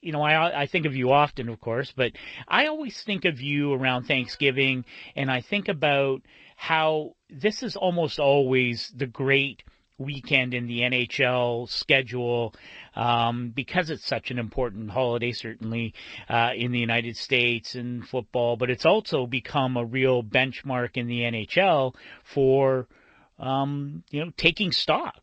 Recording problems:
garbled, watery; slightly

